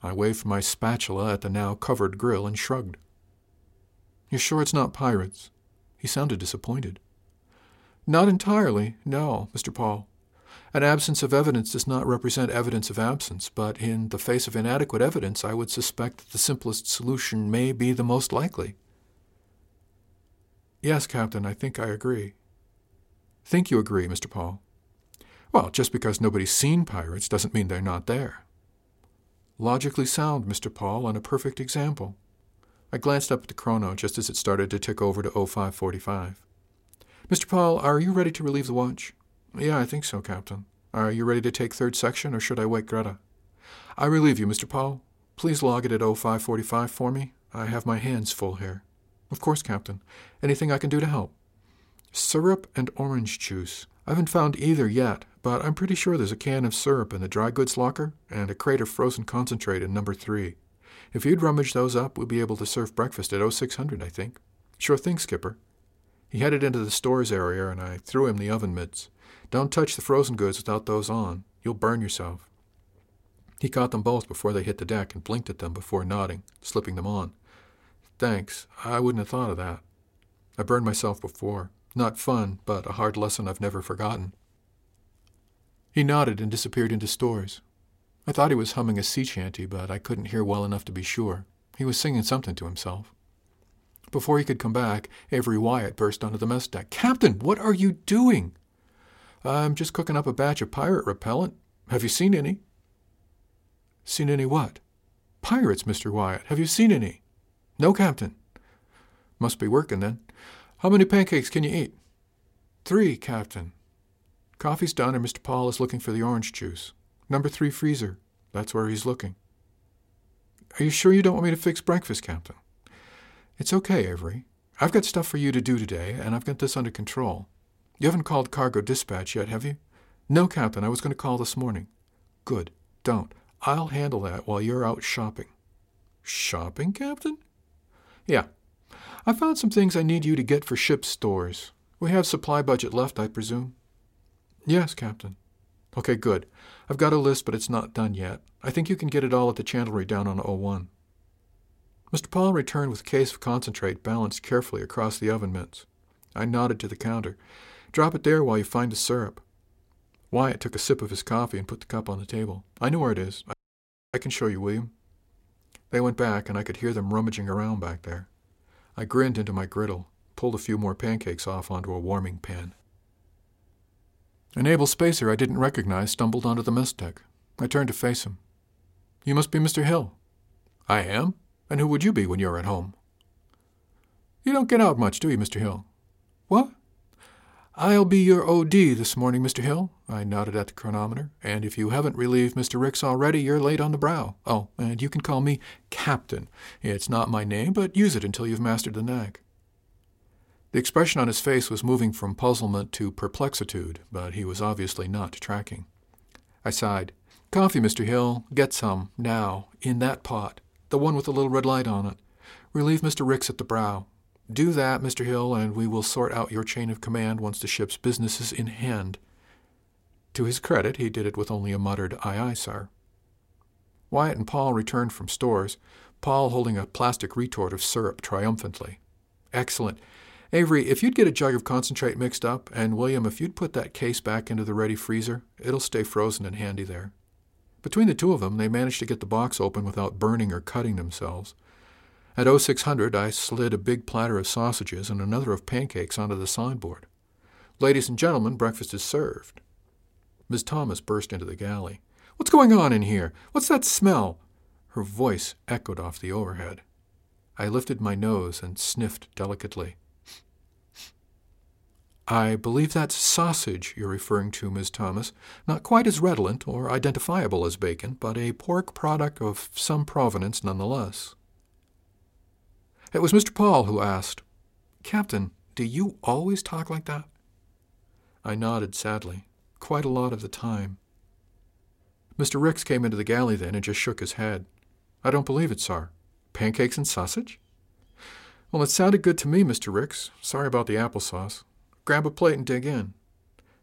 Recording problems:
audio cutting out; at 2:44 for 0.5 s

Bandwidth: 16 kHz